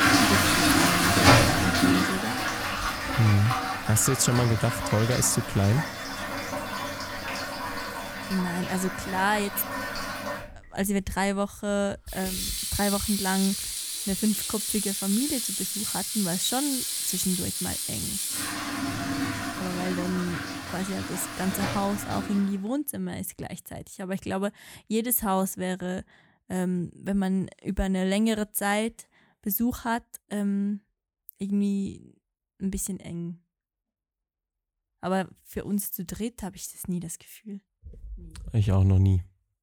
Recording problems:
household noises; very loud; until 22 s; 1 dB above the speech

